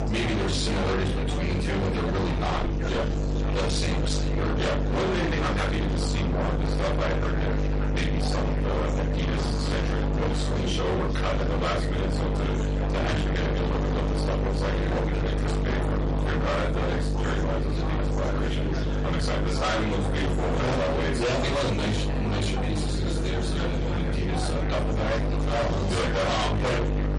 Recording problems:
distortion; heavy; 54% of the sound clipped
off-mic speech; far
room echo; slight; dies away in 0.3 s
garbled, watery; slightly; nothing above 10.5 kHz
electrical hum; loud; throughout; 50 Hz, 4 dB below the speech
chatter from many people; loud; throughout; 7 dB below the speech

